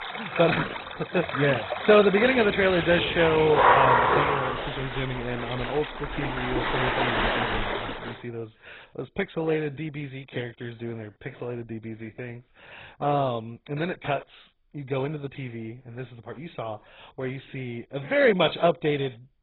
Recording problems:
garbled, watery; badly; nothing above 4 kHz
rain or running water; loud; until 8 s; as loud as the speech

